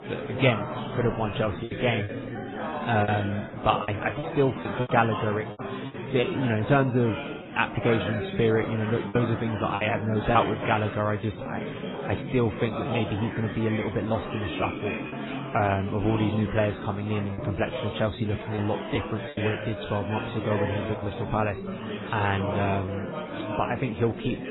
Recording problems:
garbled, watery; badly; nothing above 4 kHz
chatter from many people; loud; throughout; 6 dB below the speech
choppy; very; 6% of the speech affected

